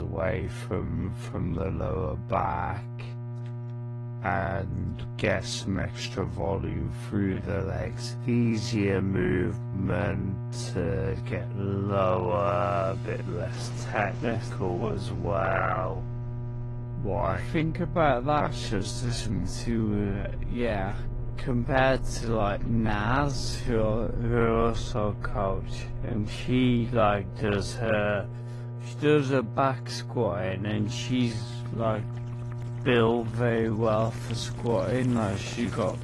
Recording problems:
wrong speed, natural pitch; too slow; 0.5 times normal speed
garbled, watery; slightly; nothing above 11 kHz
electrical hum; noticeable; throughout; 60 Hz, 15 dB below the speech
rain or running water; noticeable; throughout; 15 dB below the speech
abrupt cut into speech; at the start

